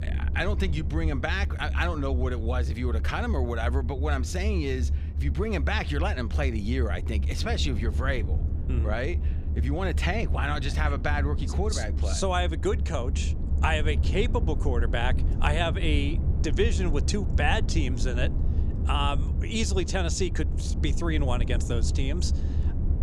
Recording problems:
low rumble; noticeable; throughout; 15 dB below the speech

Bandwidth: 15.5 kHz